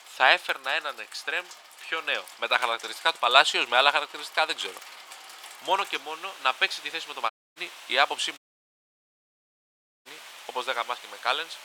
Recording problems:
thin; very; fading below 800 Hz
rain or running water; noticeable; throughout; 20 dB below the speech
audio cutting out; at 7.5 s and at 8.5 s for 1.5 s

